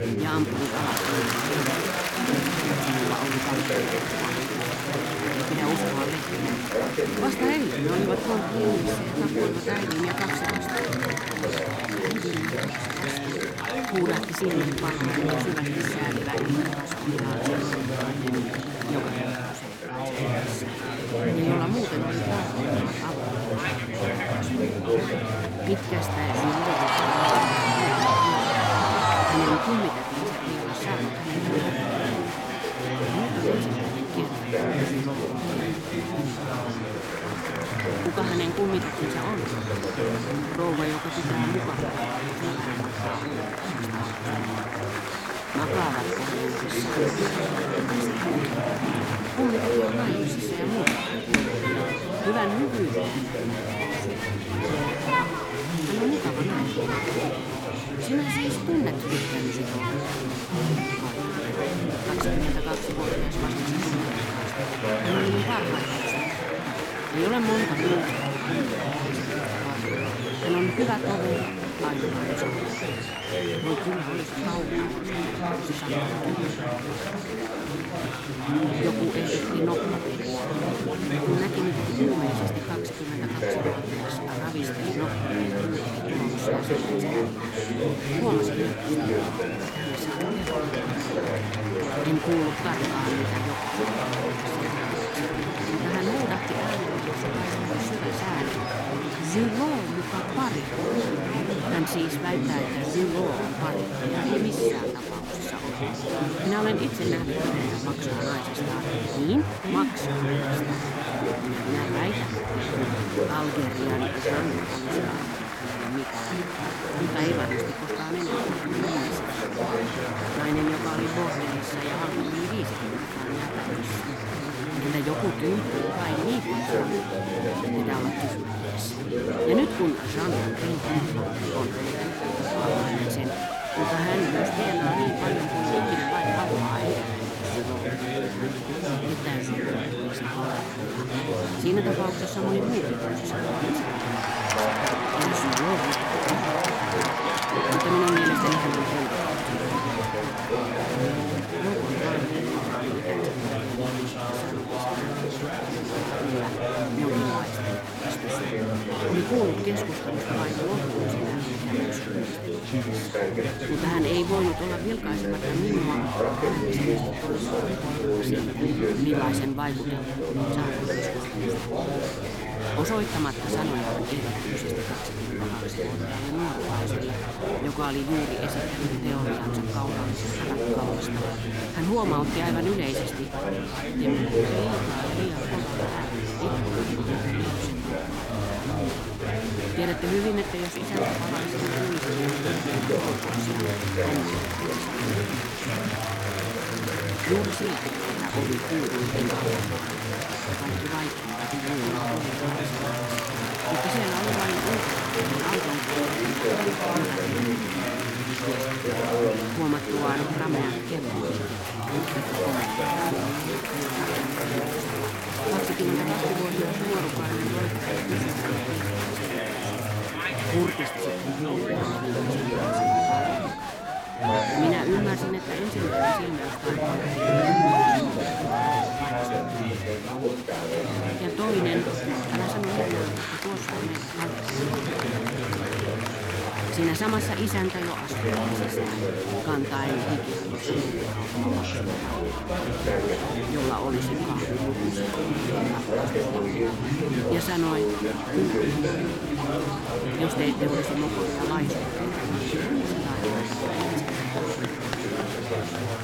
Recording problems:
chatter from many people; very loud; throughout; 5 dB above the speech

